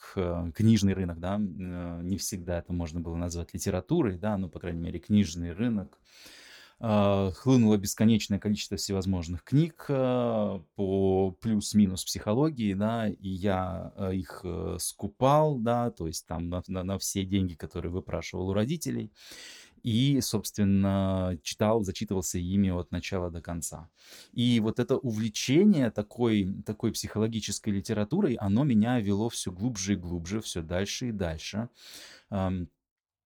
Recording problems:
uneven, jittery; strongly; from 0.5 to 29 s

